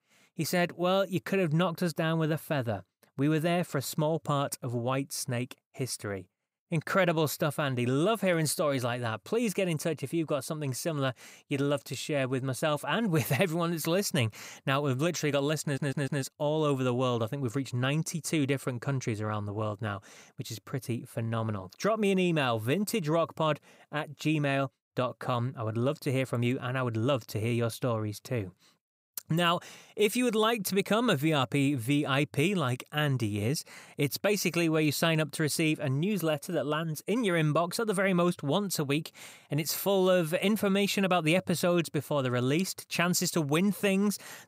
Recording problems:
audio stuttering; at 16 s

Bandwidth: 15.5 kHz